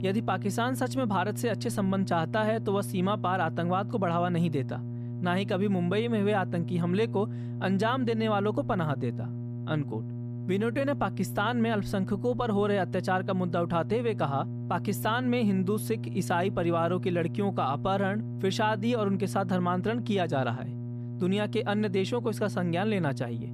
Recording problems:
electrical hum; noticeable; throughout; 60 Hz, 15 dB below the speech

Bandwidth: 14.5 kHz